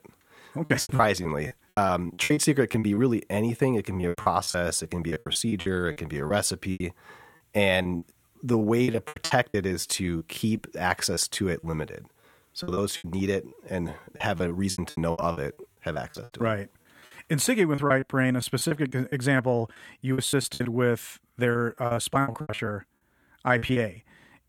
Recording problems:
choppy; very; 17% of the speech affected

